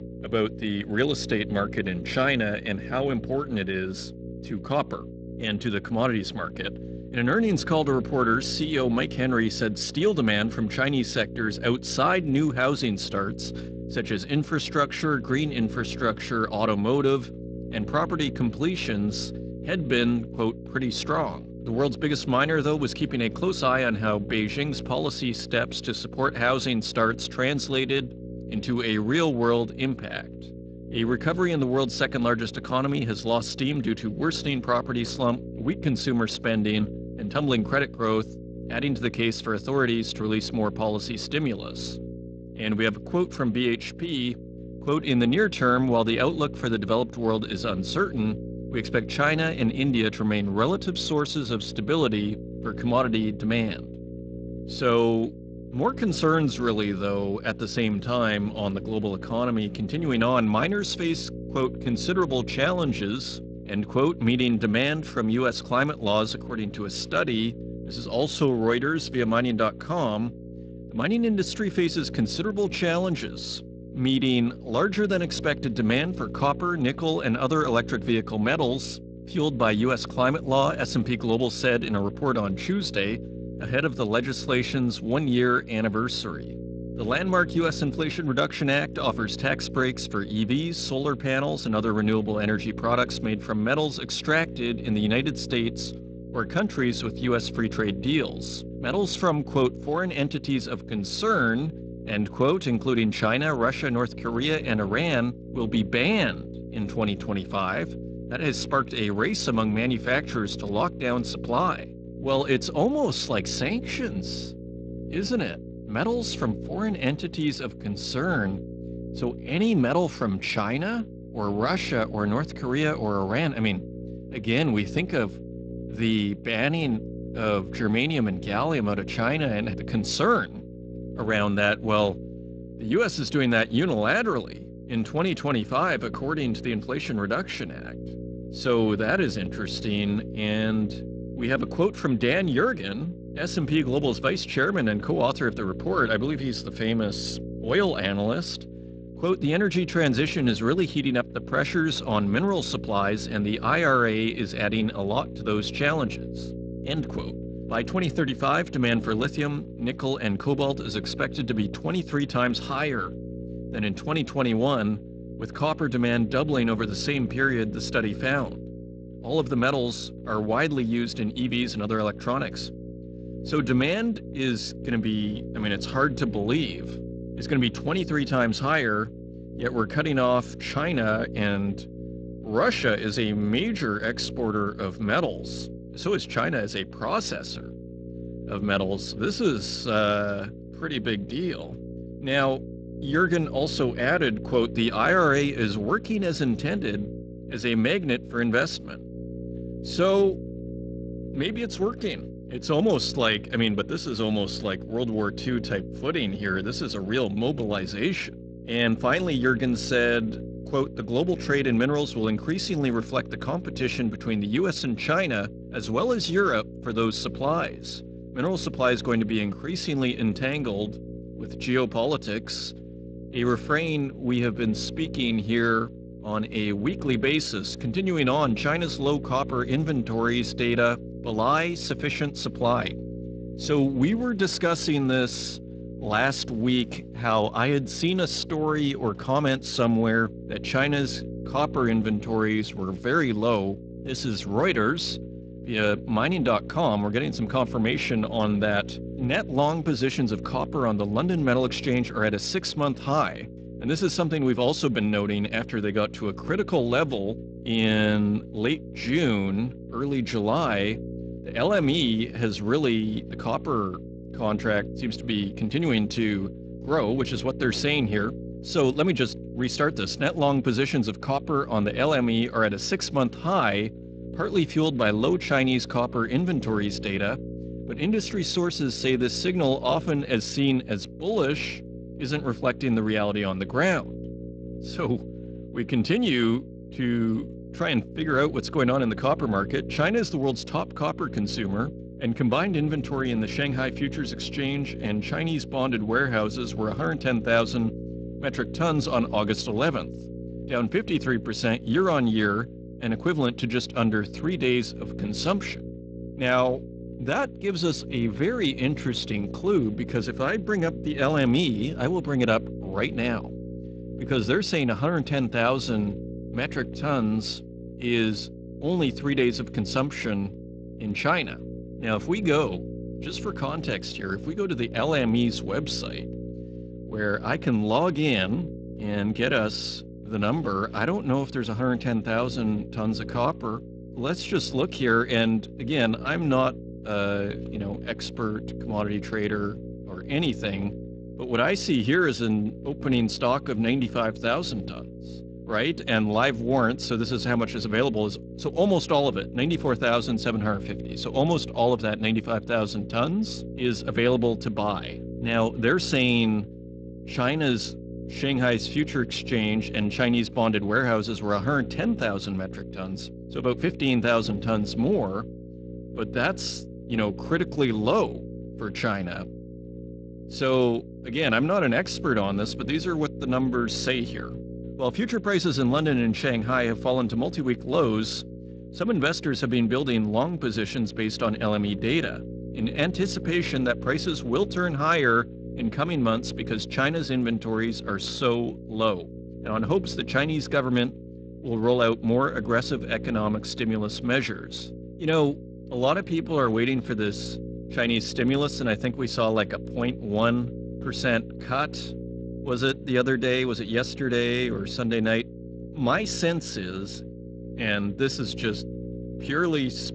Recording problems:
garbled, watery; slightly; nothing above 8 kHz
electrical hum; noticeable; throughout; 60 Hz, 15 dB below the speech

